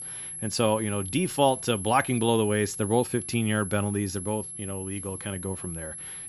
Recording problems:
high-pitched whine; loud; throughout; 11 kHz, 8 dB below the speech

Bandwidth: 15 kHz